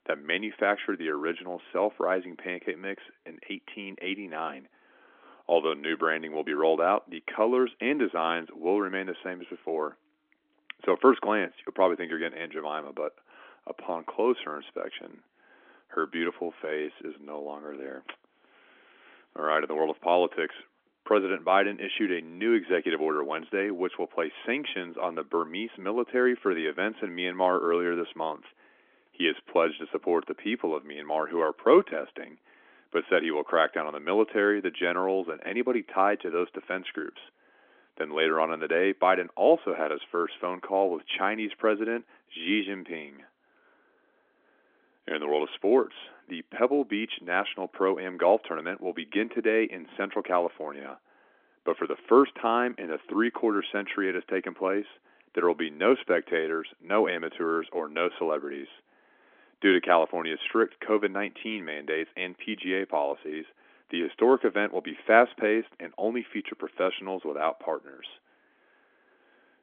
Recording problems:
phone-call audio; nothing above 3.5 kHz

